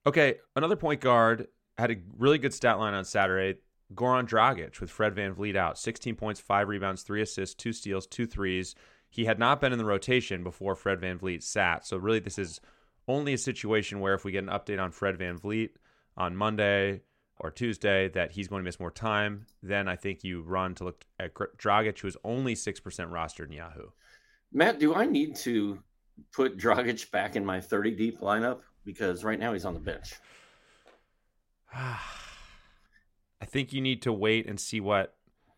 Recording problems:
none

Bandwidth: 16 kHz